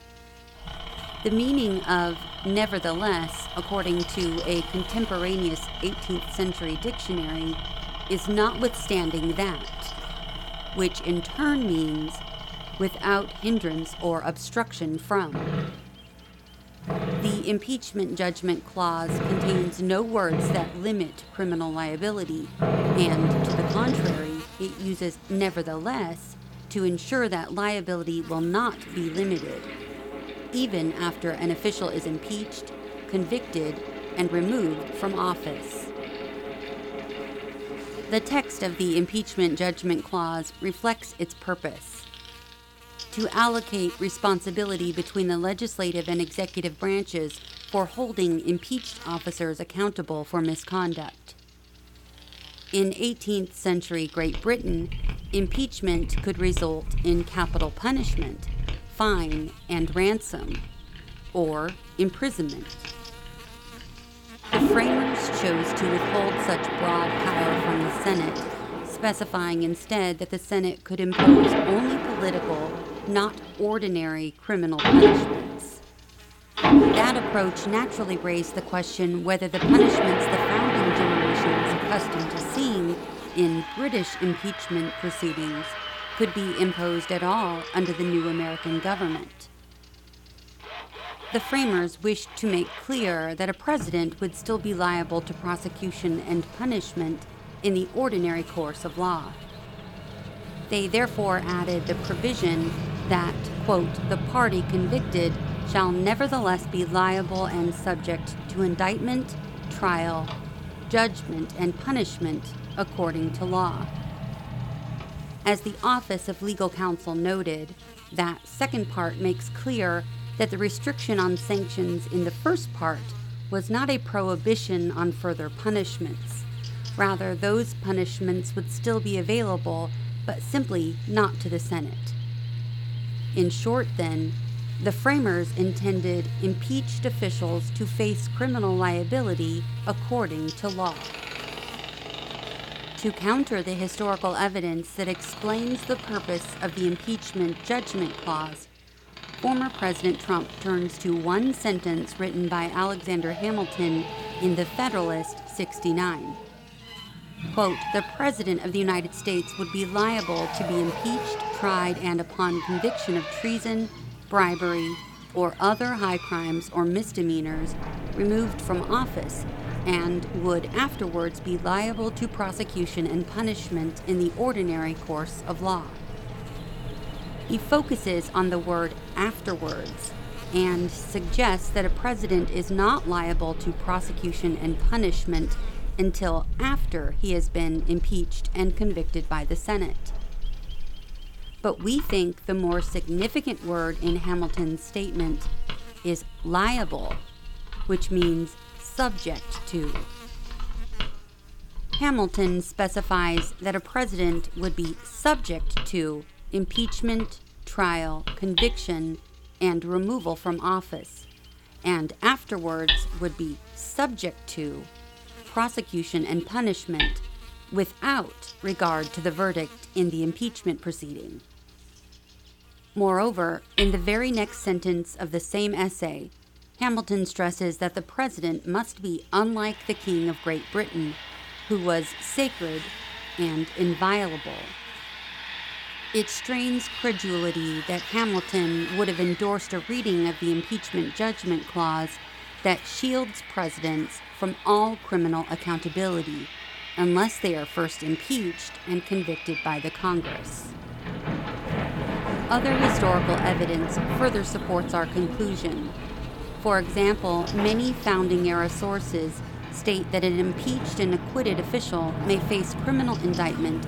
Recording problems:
machinery noise; loud; throughout; 4 dB below the speech
electrical hum; noticeable; throughout; 60 Hz, 20 dB below the speech

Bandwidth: 18 kHz